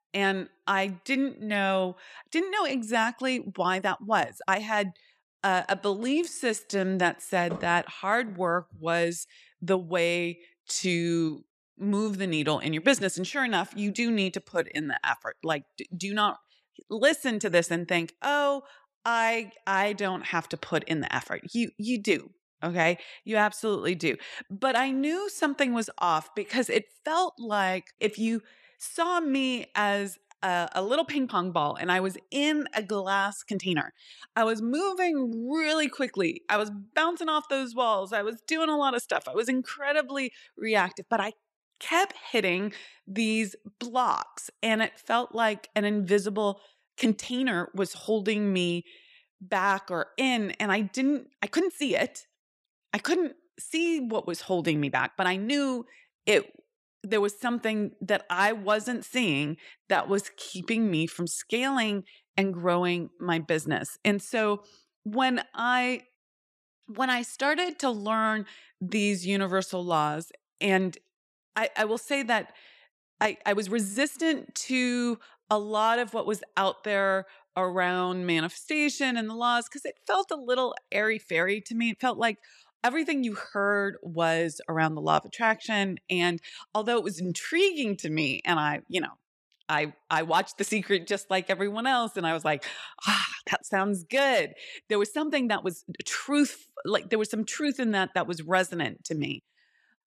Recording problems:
uneven, jittery; strongly; from 3.5 s to 1:36

